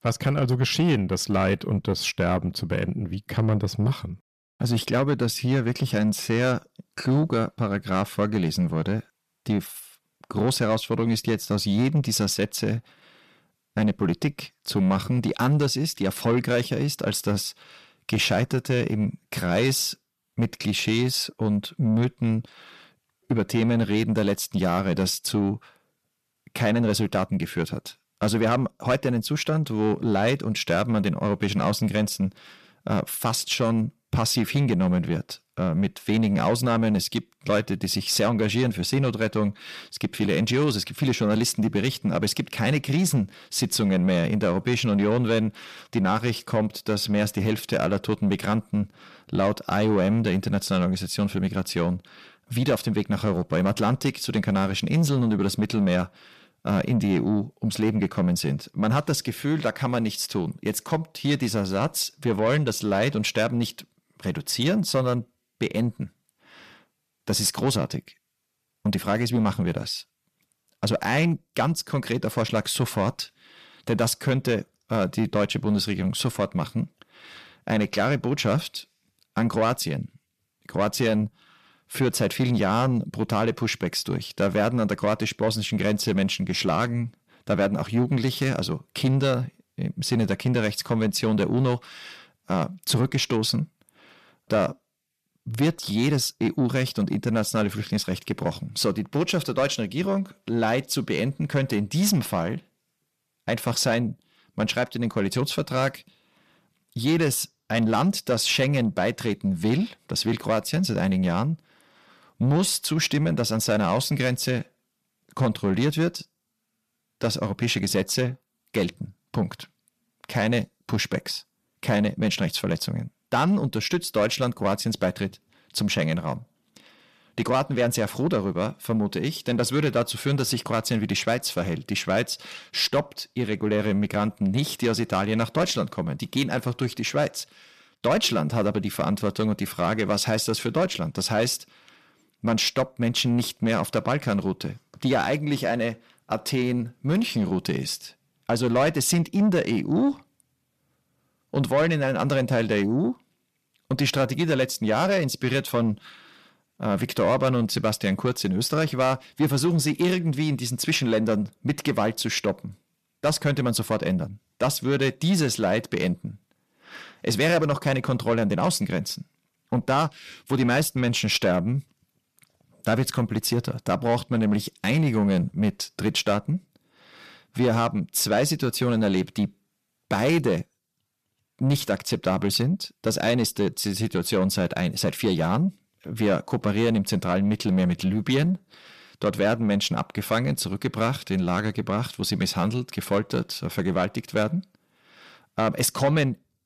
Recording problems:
distortion; slight; 10 dB below the speech

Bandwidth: 14.5 kHz